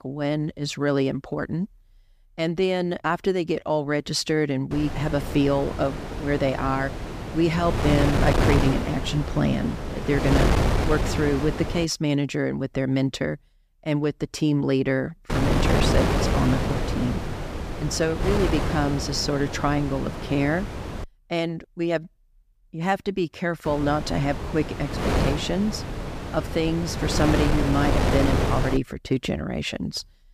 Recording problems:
wind noise on the microphone; heavy; from 4.5 to 12 s, from 15 to 21 s and from 24 to 29 s; 3 dB below the speech

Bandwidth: 15 kHz